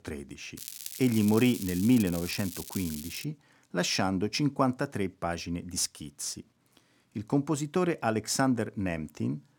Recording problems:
crackling; noticeable; from 0.5 to 3 s; 10 dB below the speech

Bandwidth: 18 kHz